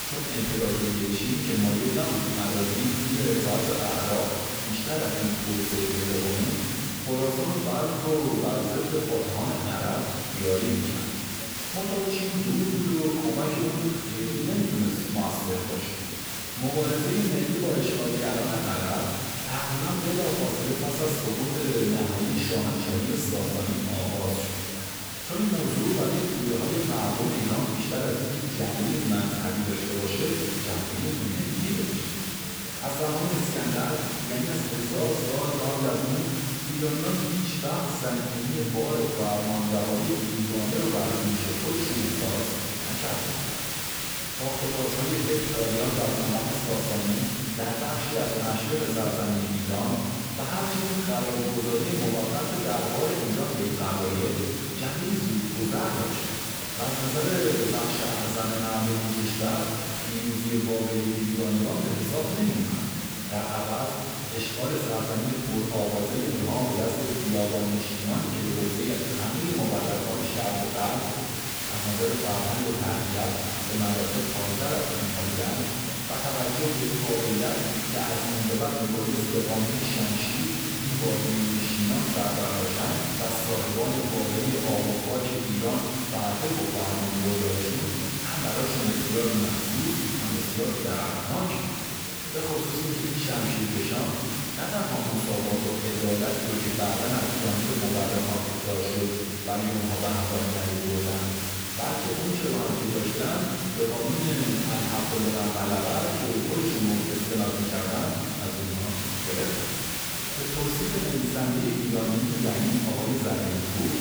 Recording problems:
room echo; strong; dies away in 2.2 s
off-mic speech; far
hiss; loud; throughout; 2 dB below the speech
chatter from many people; noticeable; throughout; 20 dB below the speech

